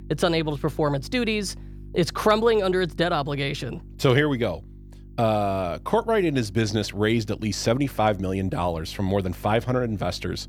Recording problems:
electrical hum; faint; throughout; 50 Hz, 30 dB below the speech

